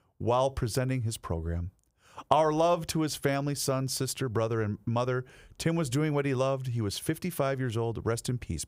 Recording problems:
none

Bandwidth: 15.5 kHz